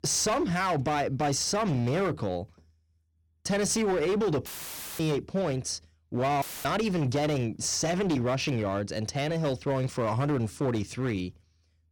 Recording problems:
distortion; slight; 15% of the sound clipped
audio cutting out; filled with static; at 4.5 s for 0.5 s and at 6.5 s

